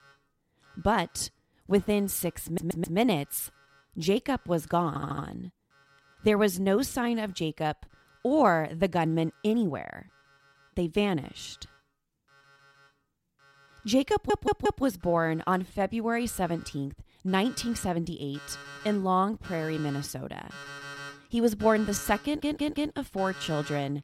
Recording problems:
alarms or sirens; noticeable; throughout; 15 dB below the speech
audio stuttering; 4 times, first at 2.5 s

